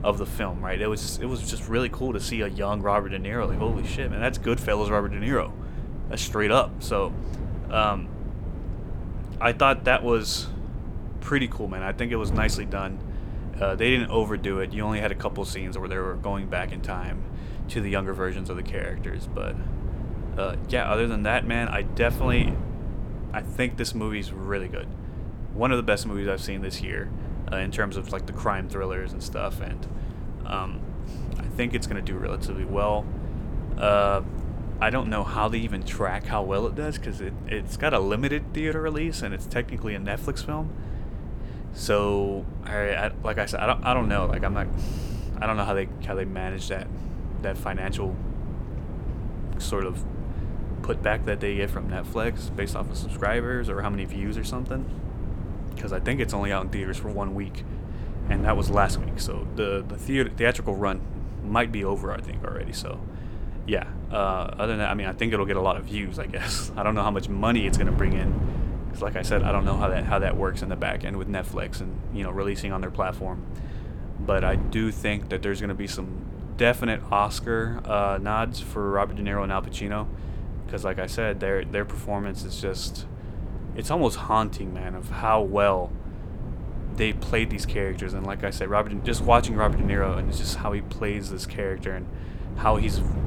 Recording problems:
wind noise on the microphone; occasional gusts; 15 dB below the speech

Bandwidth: 17.5 kHz